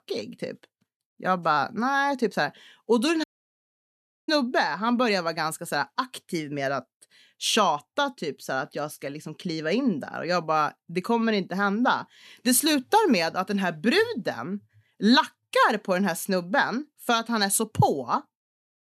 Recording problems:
audio cutting out; at 3 s for 1 s

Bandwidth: 13.5 kHz